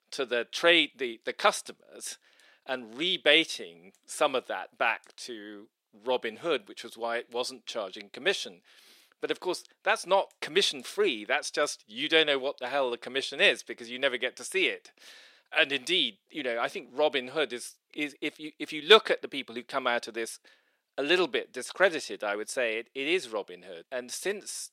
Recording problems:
thin; somewhat; fading below 350 Hz

